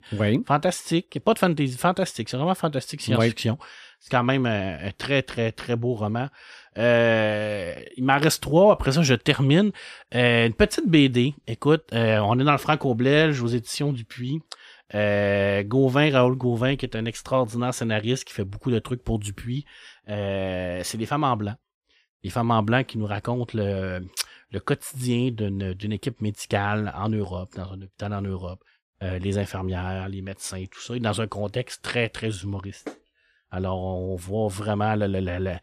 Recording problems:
none

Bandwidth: 14.5 kHz